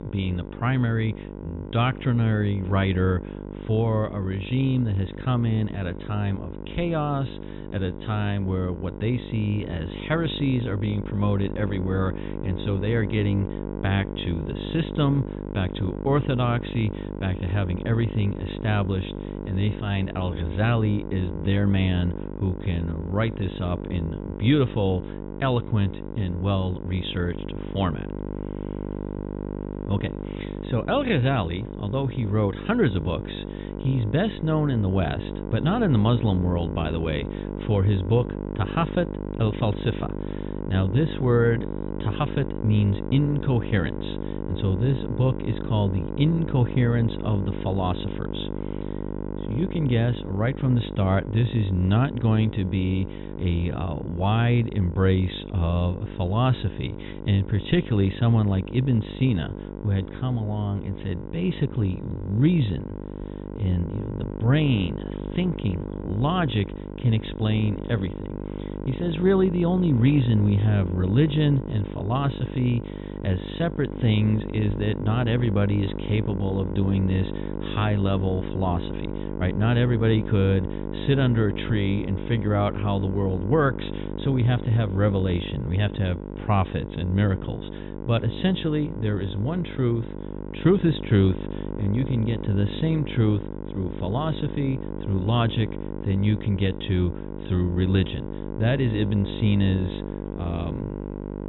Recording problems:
high frequencies cut off; severe; nothing above 3.5 kHz
electrical hum; loud; throughout; 50 Hz, 8 dB below the speech

